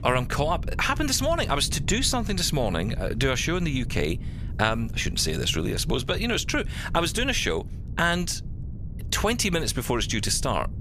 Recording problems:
low rumble; faint; throughout; 20 dB below the speech

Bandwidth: 15 kHz